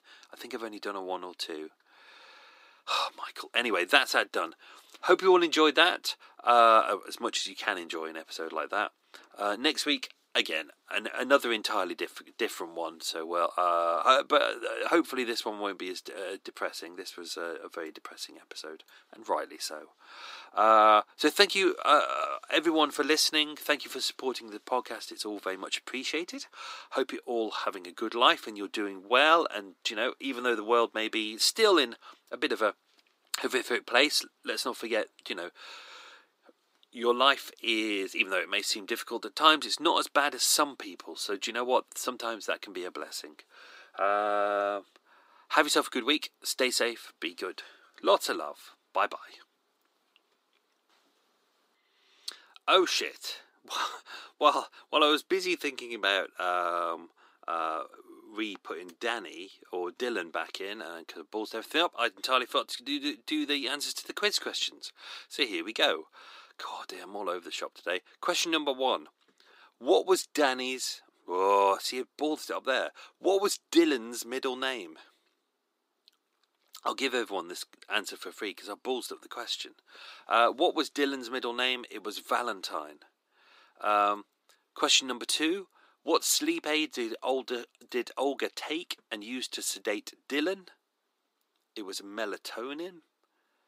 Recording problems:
thin; somewhat; fading below 300 Hz

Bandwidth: 15.5 kHz